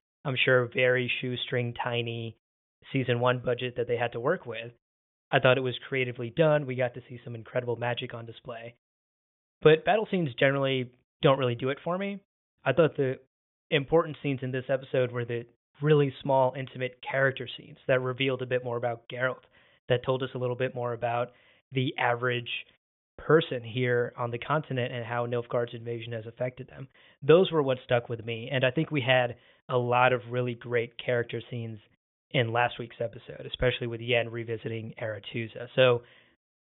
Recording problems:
high frequencies cut off; severe; nothing above 3.5 kHz

